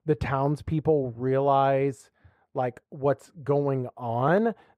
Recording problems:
muffled; very; fading above 2.5 kHz

